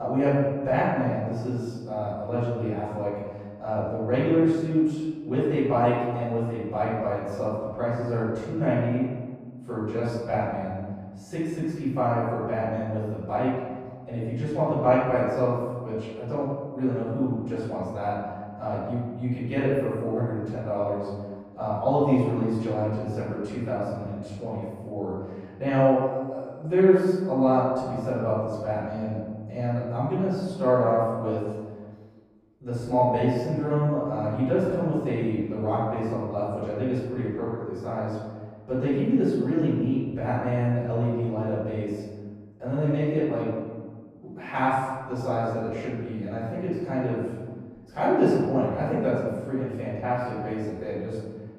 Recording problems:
room echo; strong; dies away in 1.4 s
off-mic speech; far
muffled; very; fading above 1.5 kHz
abrupt cut into speech; at the start

